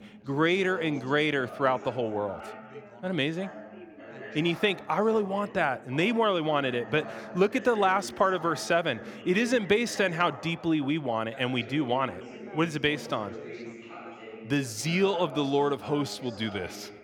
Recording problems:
background chatter; noticeable; throughout; 3 voices, 15 dB below the speech

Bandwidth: 18 kHz